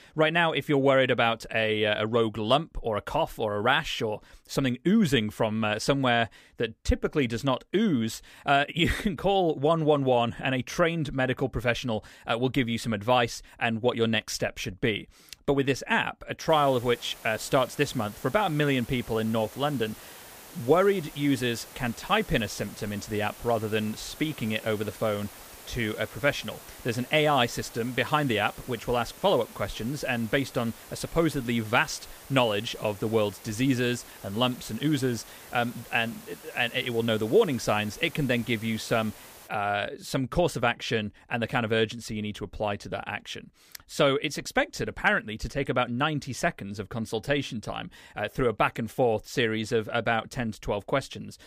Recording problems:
hiss; noticeable; from 16 to 39 s; 20 dB below the speech

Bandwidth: 15 kHz